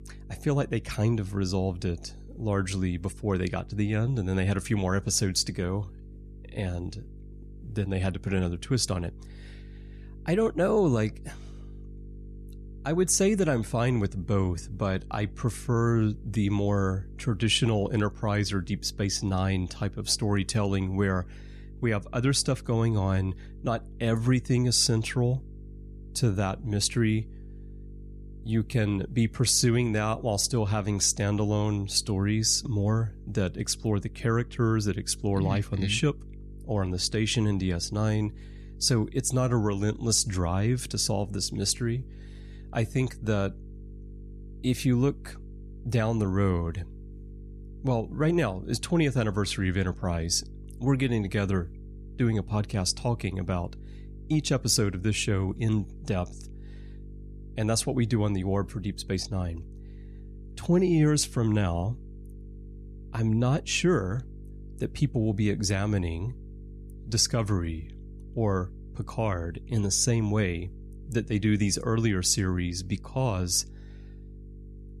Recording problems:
electrical hum; faint; throughout; 50 Hz, 25 dB below the speech

